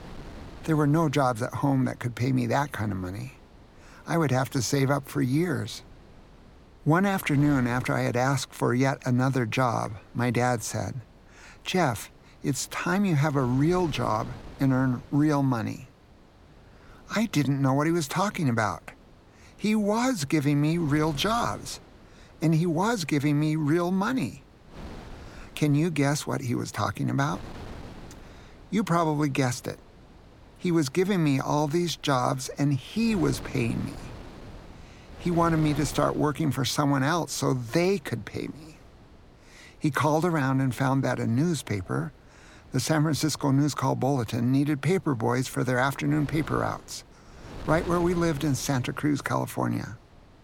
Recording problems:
wind noise on the microphone; occasional gusts; 20 dB below the speech

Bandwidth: 17 kHz